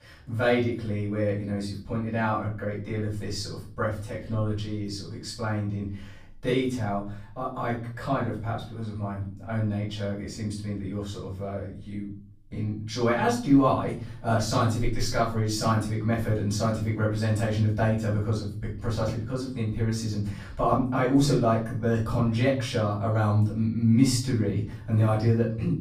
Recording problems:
off-mic speech; far
room echo; noticeable; dies away in 0.5 s

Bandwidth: 15 kHz